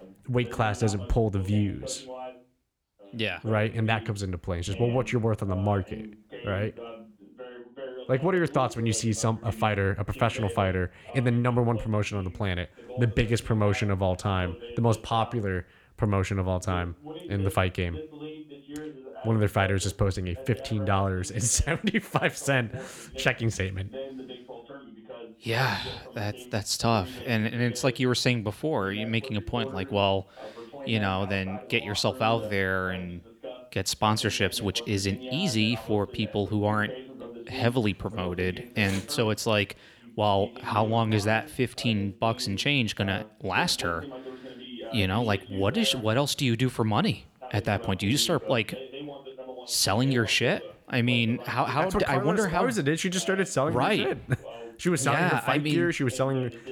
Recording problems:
voice in the background; noticeable; throughout; 15 dB below the speech

